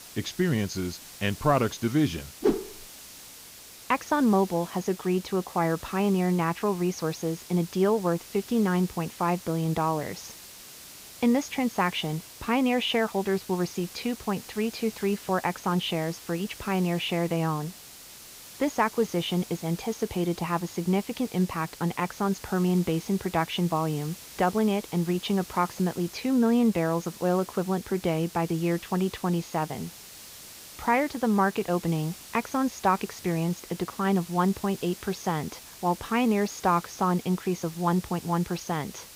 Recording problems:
high frequencies cut off; noticeable; nothing above 7 kHz
hiss; noticeable; throughout; 15 dB below the speech

